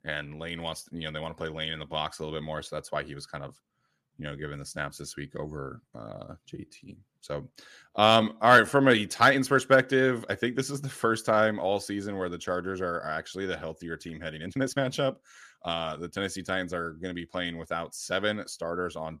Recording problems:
uneven, jittery; strongly; from 4 to 15 s

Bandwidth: 14.5 kHz